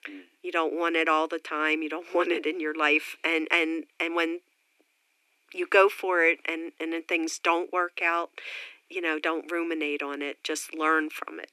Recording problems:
thin; very; fading below 300 Hz

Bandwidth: 13.5 kHz